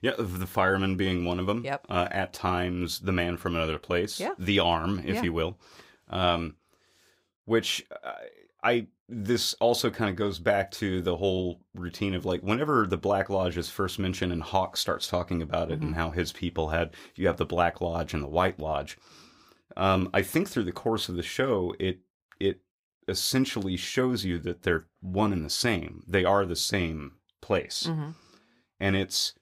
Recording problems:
none

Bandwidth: 15.5 kHz